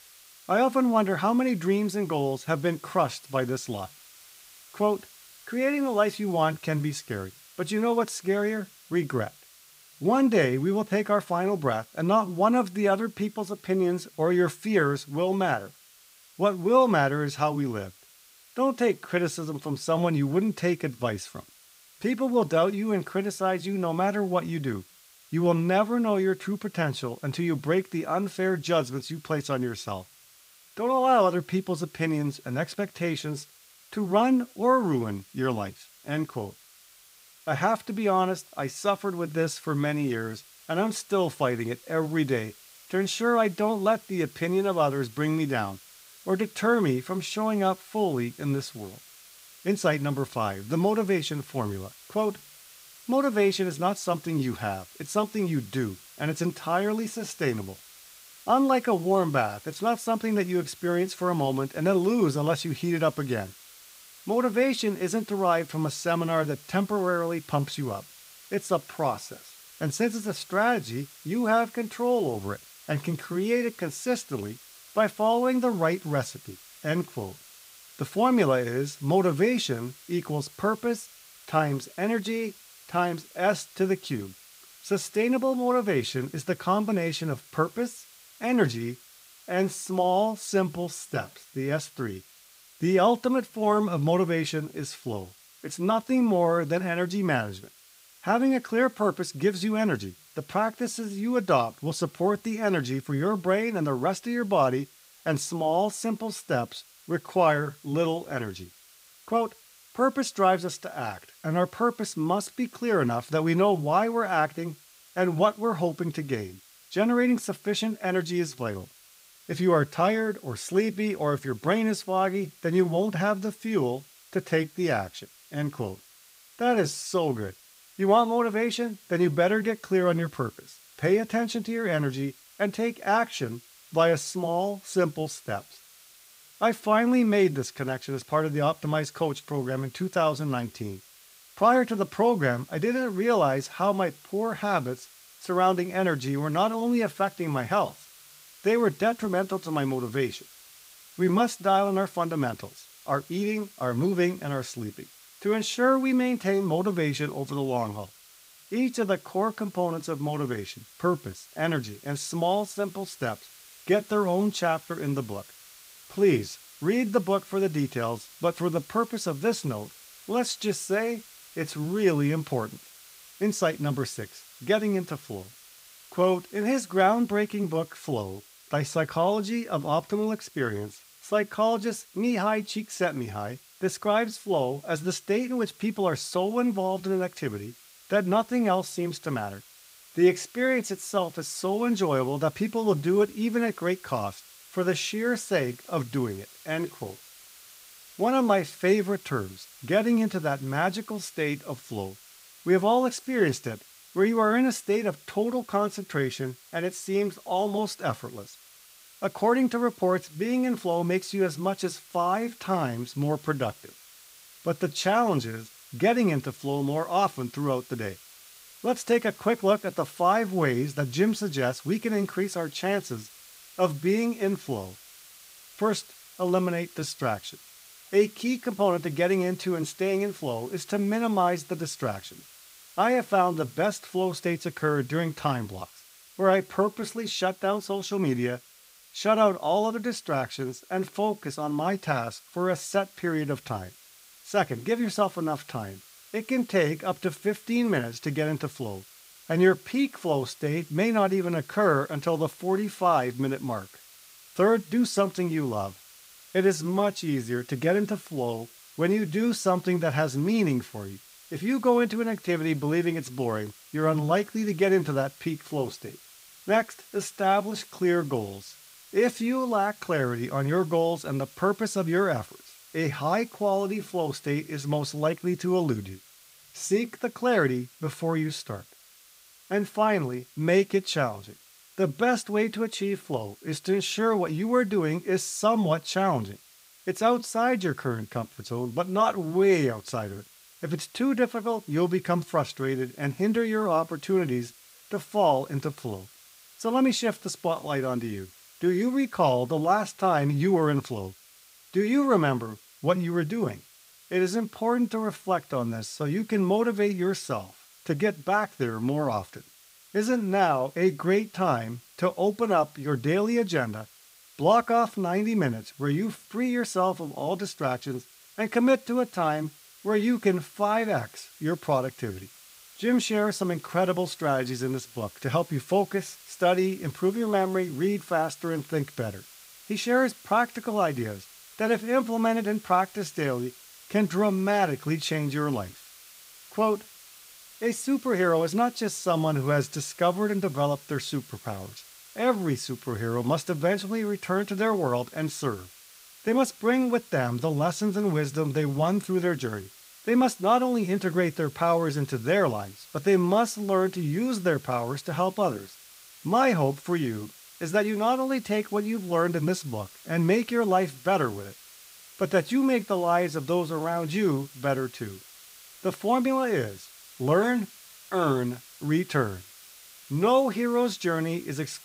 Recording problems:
hiss; faint; throughout; 20 dB below the speech

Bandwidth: 15.5 kHz